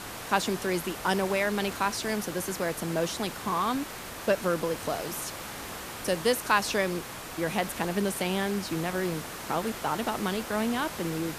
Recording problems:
hiss; loud; throughout; 8 dB below the speech

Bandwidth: 14.5 kHz